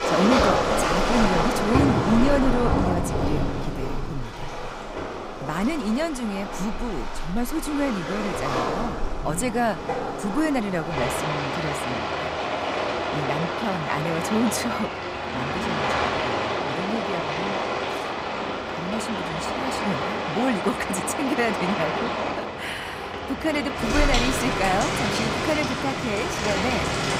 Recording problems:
rain or running water; very loud; throughout; 1 dB above the speech

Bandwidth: 15.5 kHz